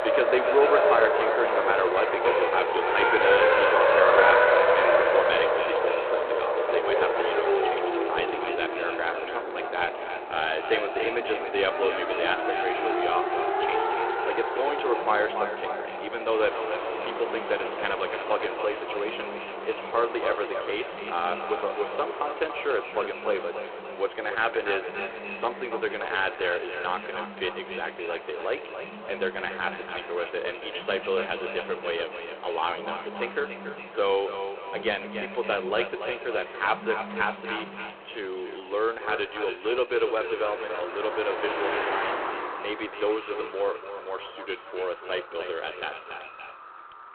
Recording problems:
phone-call audio; poor line
echo of what is said; strong; throughout; 280 ms later, 7 dB below the speech
traffic noise; very loud; throughout; 3 dB above the speech
alarms or sirens; noticeable; throughout; 20 dB below the speech
animal sounds; faint; throughout; 25 dB below the speech

